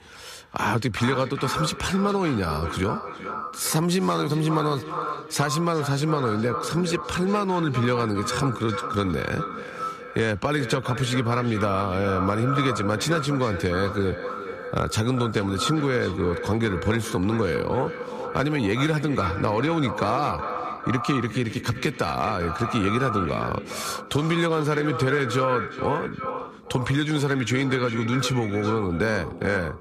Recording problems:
echo of what is said; strong; throughout; 410 ms later, 7 dB below the speech

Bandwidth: 14.5 kHz